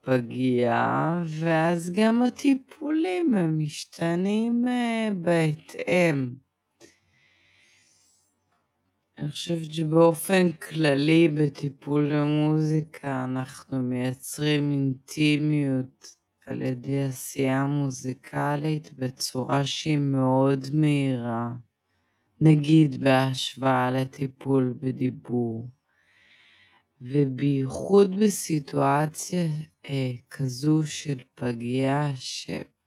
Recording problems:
wrong speed, natural pitch; too slow; 0.5 times normal speed

